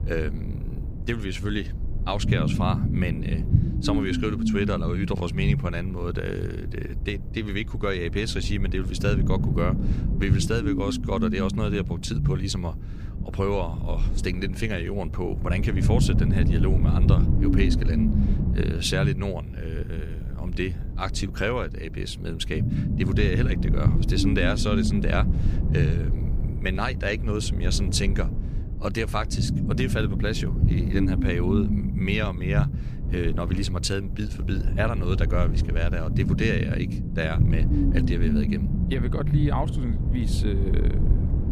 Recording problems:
low rumble; loud; throughout; 5 dB below the speech

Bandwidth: 15 kHz